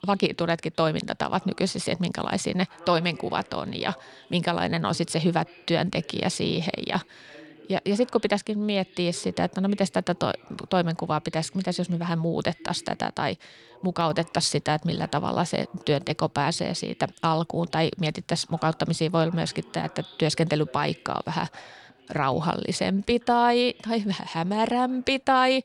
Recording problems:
voice in the background; faint; throughout; 25 dB below the speech

